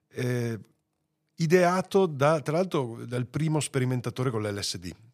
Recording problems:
none

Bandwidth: 15 kHz